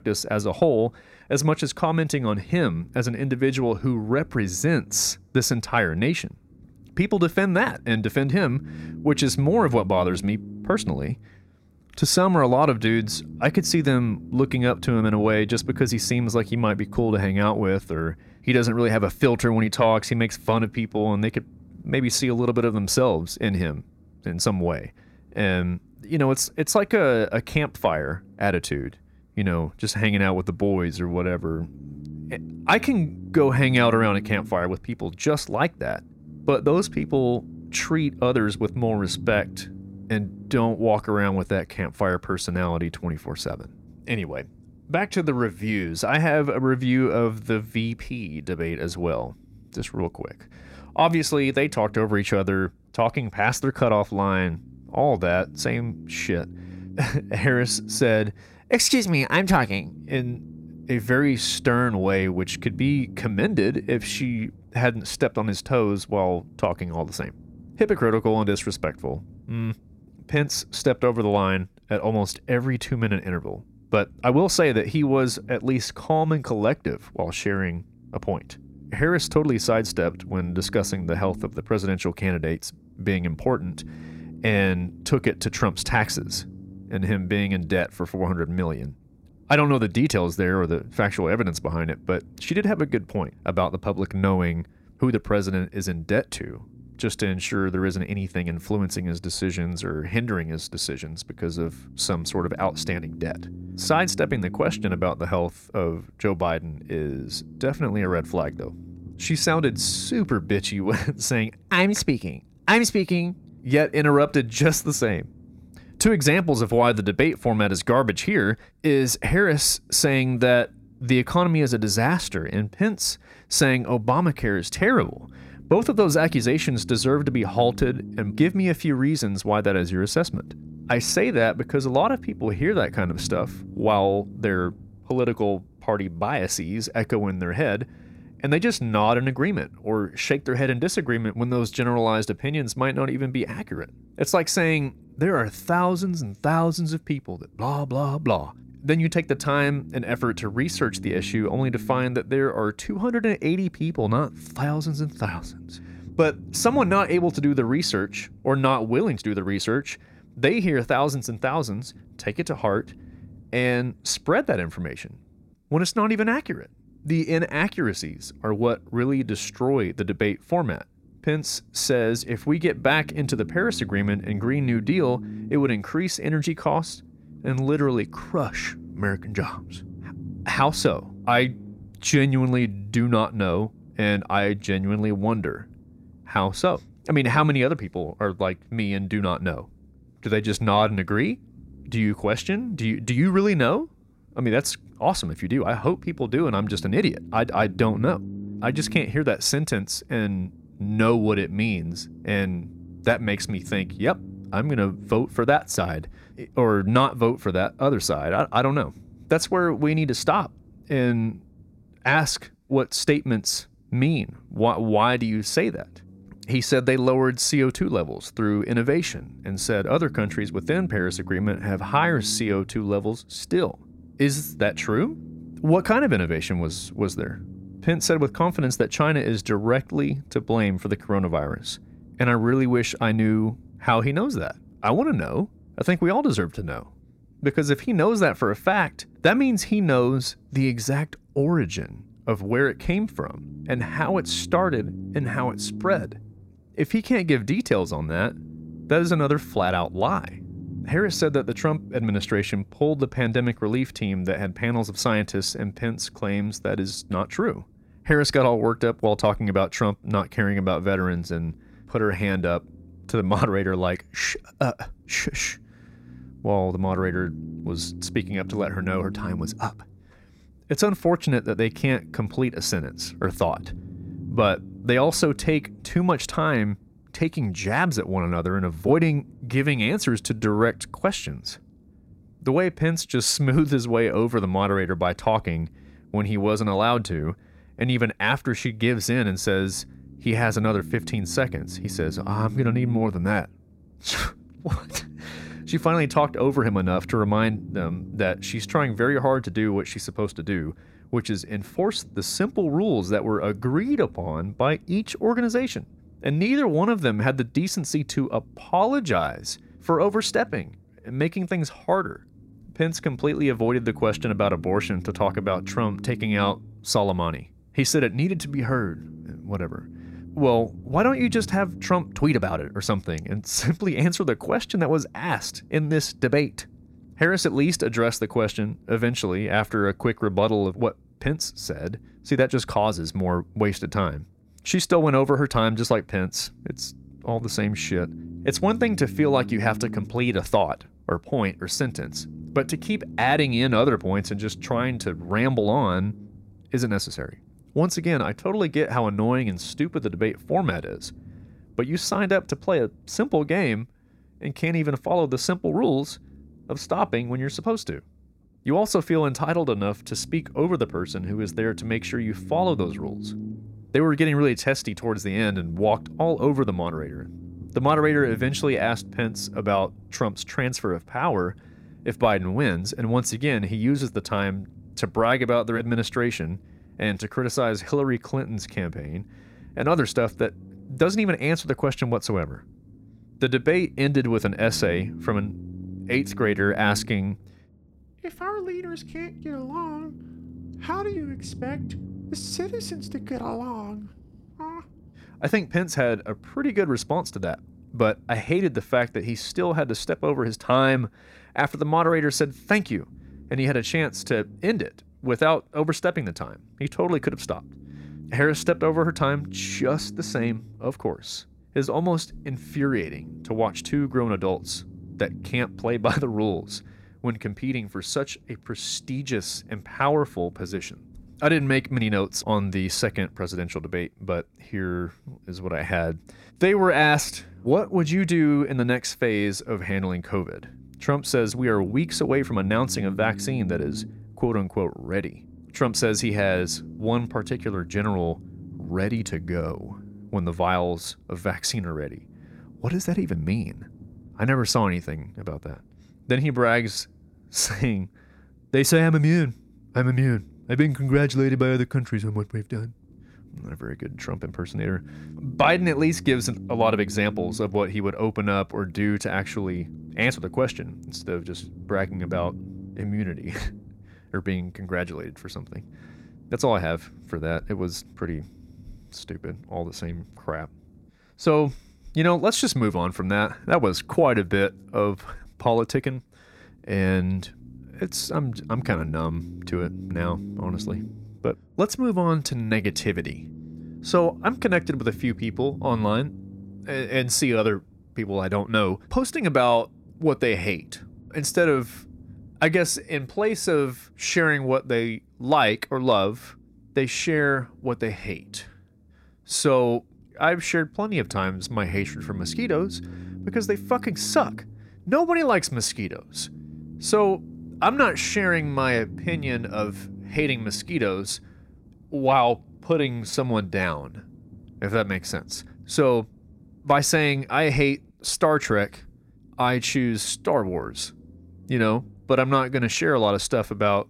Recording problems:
low rumble; faint; throughout; 25 dB below the speech

